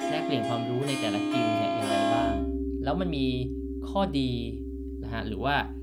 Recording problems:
background music; very loud; throughout; 1 dB above the speech

